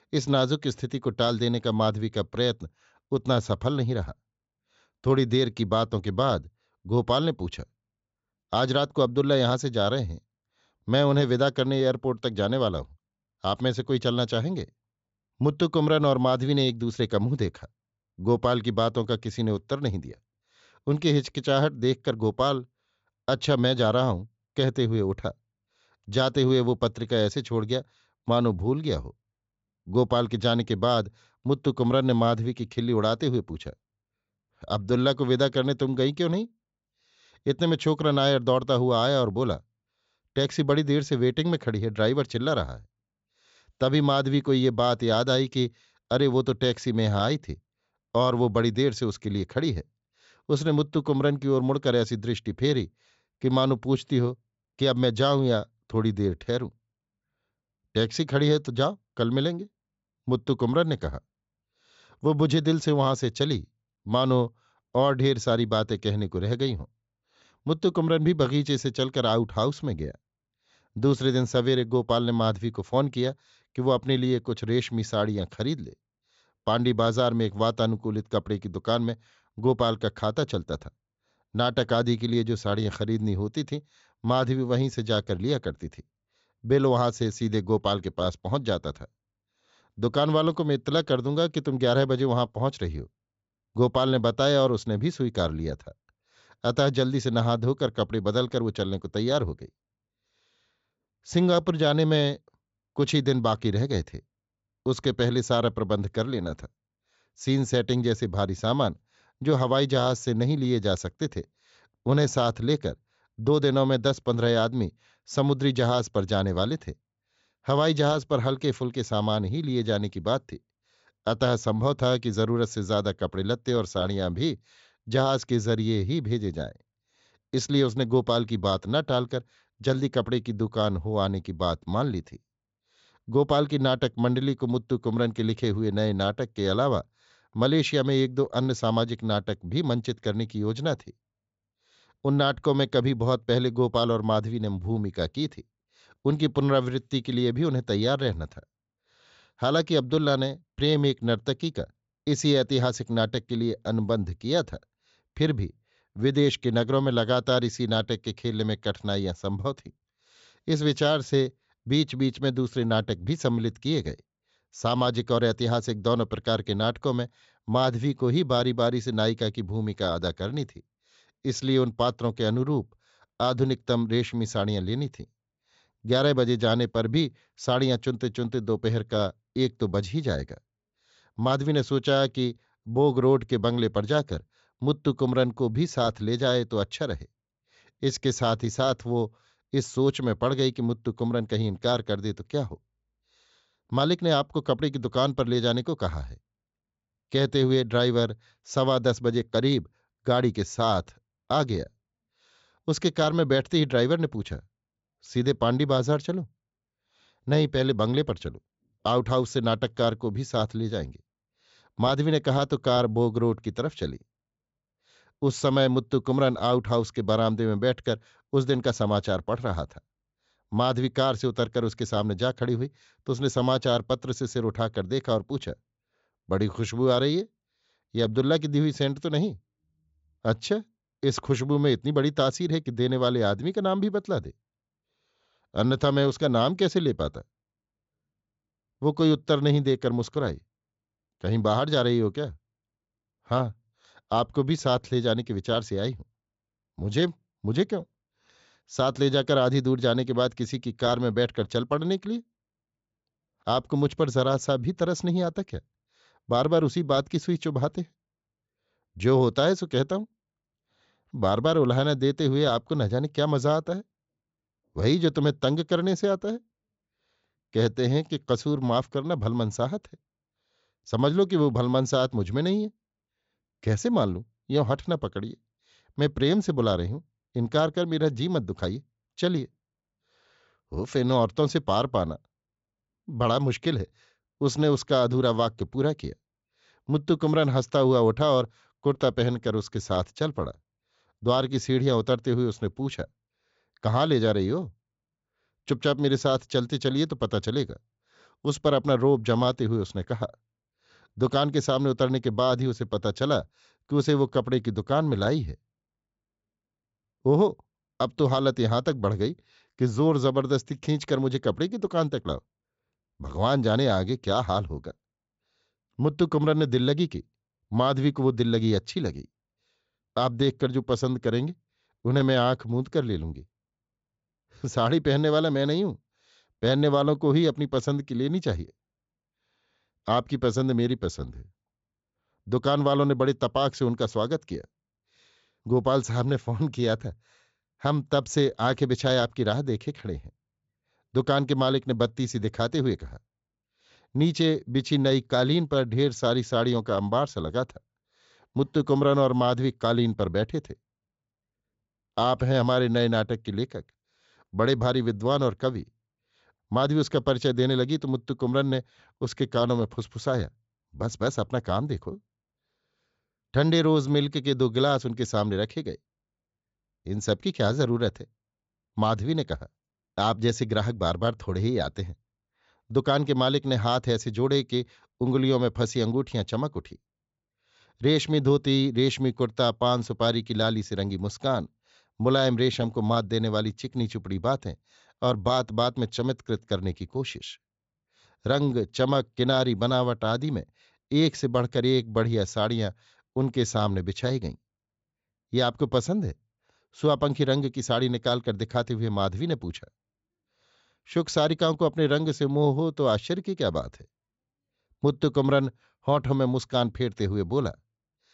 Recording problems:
high frequencies cut off; noticeable; nothing above 8 kHz

